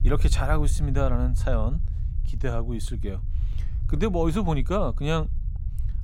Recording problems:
low rumble; noticeable; throughout; 20 dB below the speech

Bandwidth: 16 kHz